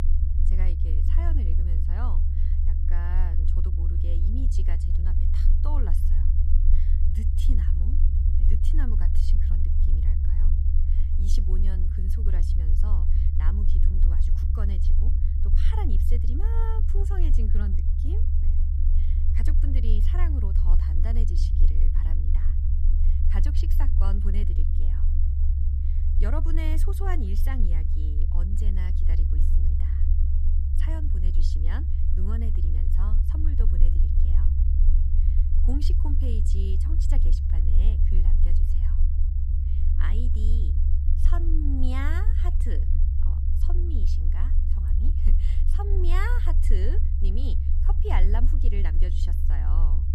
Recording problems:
low rumble; loud; throughout; 3 dB below the speech

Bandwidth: 15.5 kHz